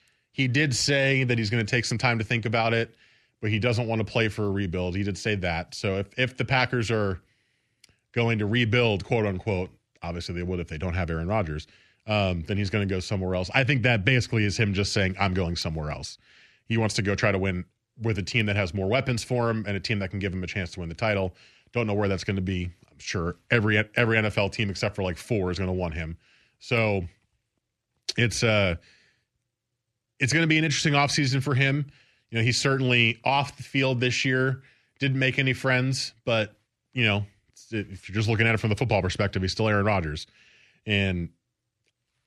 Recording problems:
none

